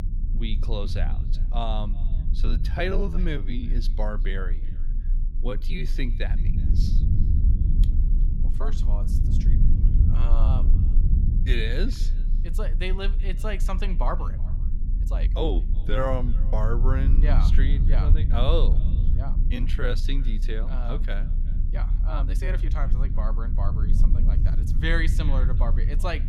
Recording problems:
echo of what is said; faint; throughout; 370 ms later, 25 dB below the speech
low rumble; loud; throughout; 9 dB below the speech
uneven, jittery; strongly; from 2 to 23 s

